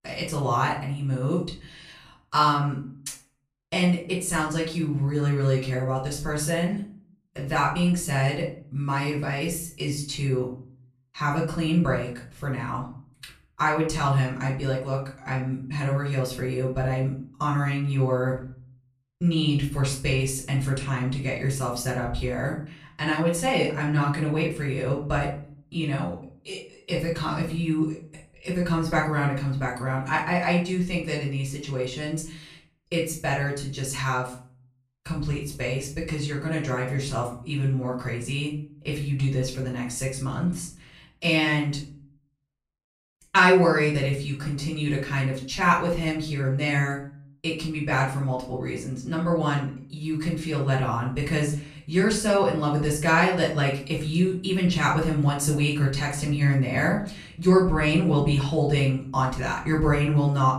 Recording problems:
off-mic speech; far
room echo; slight; dies away in 0.4 s

